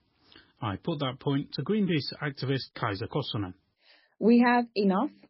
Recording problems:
garbled, watery; badly; nothing above 5 kHz

